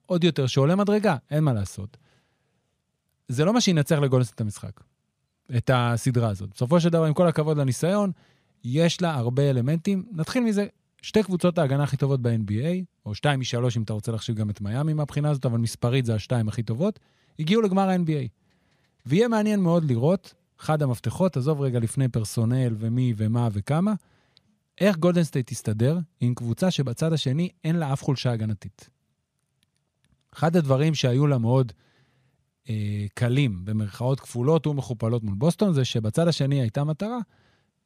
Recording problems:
none

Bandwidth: 15 kHz